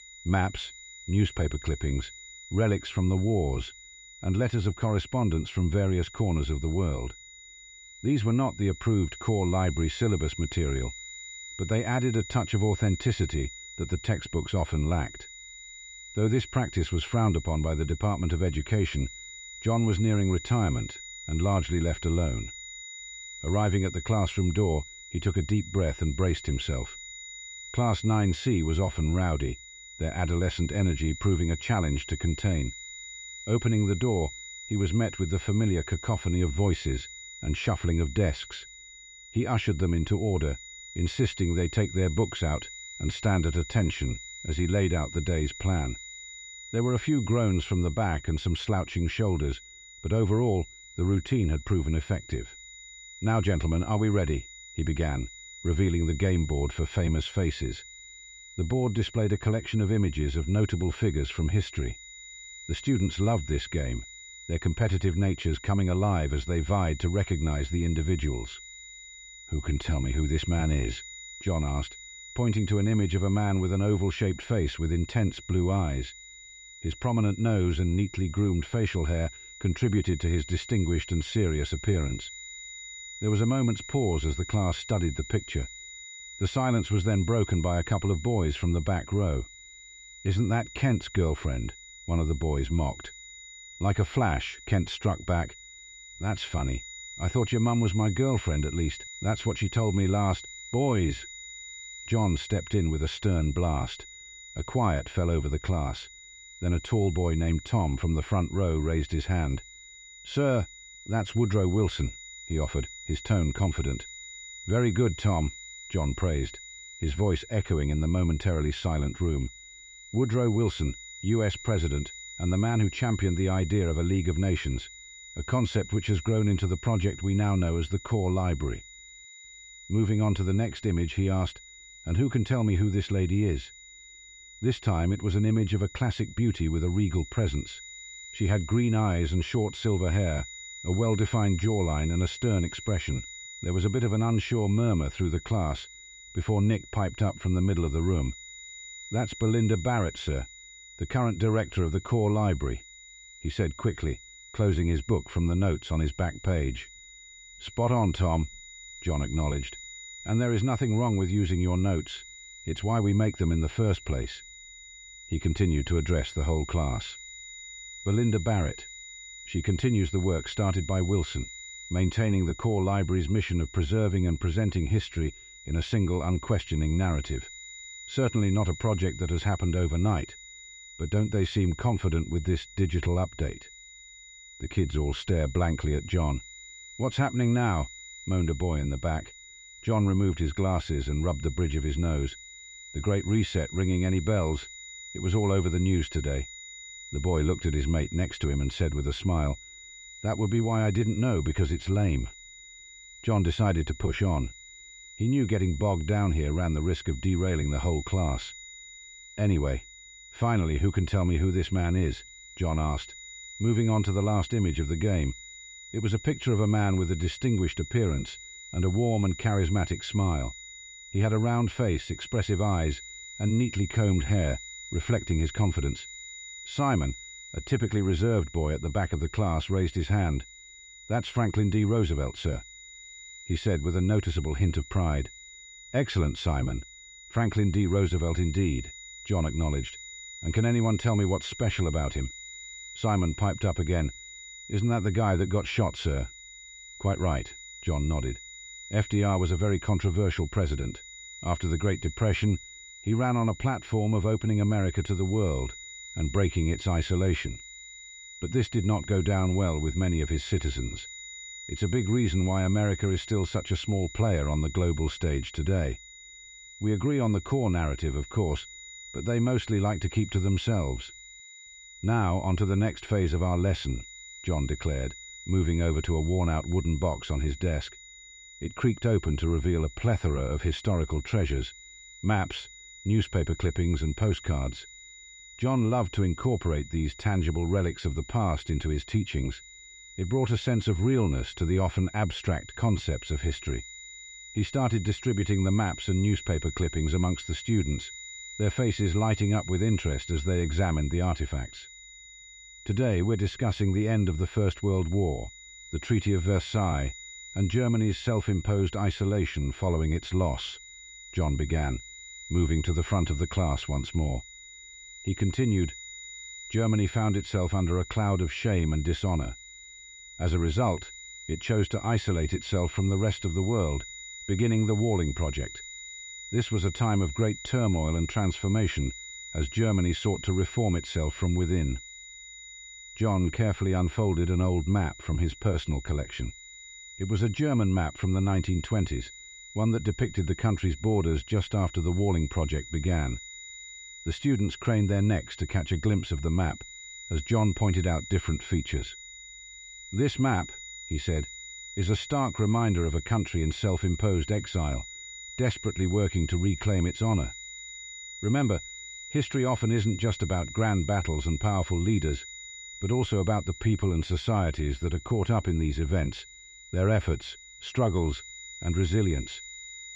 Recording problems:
muffled; slightly; fading above 3 kHz
high-pitched whine; noticeable; throughout; 2 kHz, 15 dB below the speech

